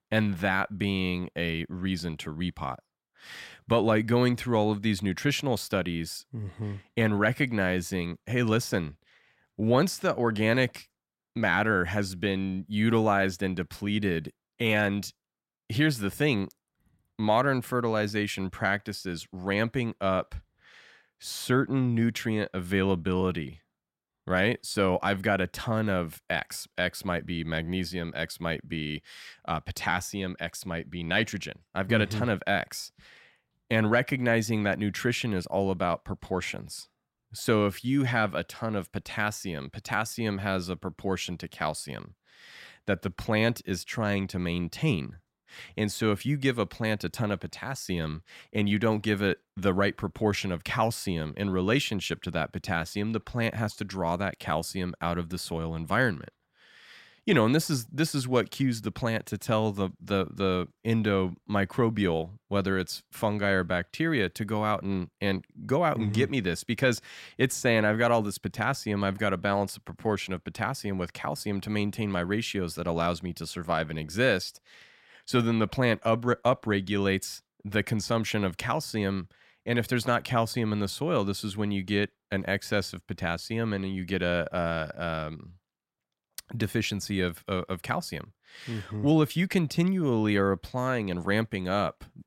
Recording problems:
none

